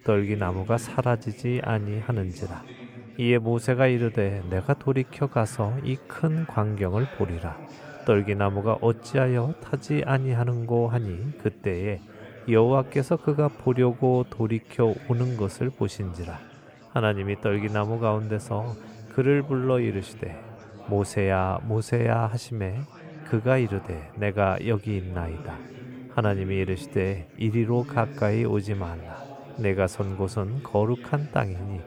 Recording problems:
chatter from many people; noticeable; throughout; 20 dB below the speech

